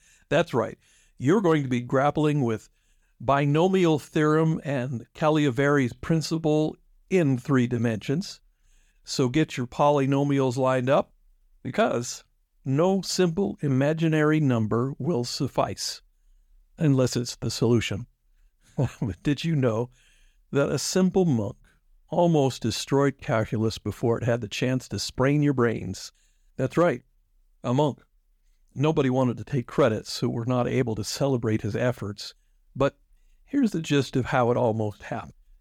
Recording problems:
none

